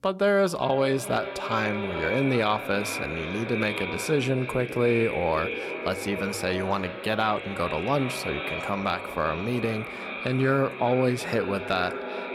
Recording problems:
echo of what is said; strong; throughout; 380 ms later, 6 dB below the speech

